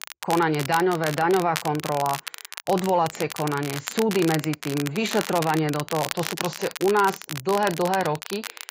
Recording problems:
garbled, watery; badly; nothing above 7.5 kHz
crackle, like an old record; loud; 9 dB below the speech

